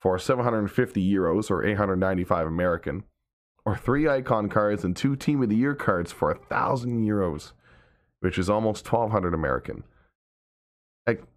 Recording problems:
muffled; slightly; fading above 2.5 kHz

